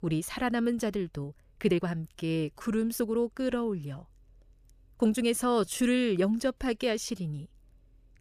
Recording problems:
uneven, jittery; strongly; from 1 to 7.5 s

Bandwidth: 14.5 kHz